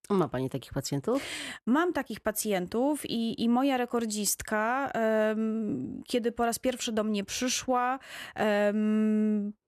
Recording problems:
none

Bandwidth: 14 kHz